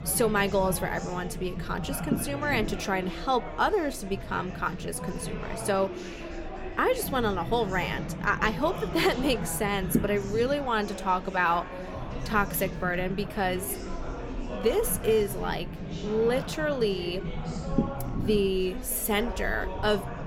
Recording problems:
murmuring crowd; noticeable; throughout; 10 dB below the speech
low rumble; noticeable; throughout; 15 dB below the speech

